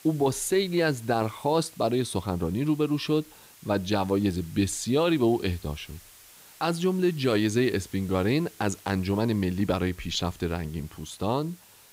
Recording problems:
hiss; faint; throughout; 25 dB below the speech

